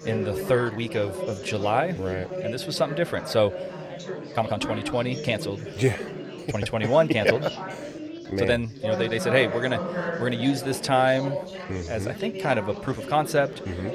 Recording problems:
chatter from many people; loud; throughout; 8 dB below the speech
uneven, jittery; strongly; from 0.5 to 13 s

